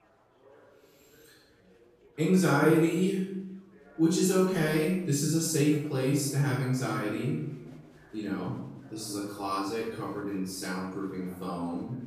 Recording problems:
off-mic speech; far
room echo; noticeable; dies away in 0.8 s
chatter from many people; faint; throughout; 30 dB below the speech

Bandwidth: 15 kHz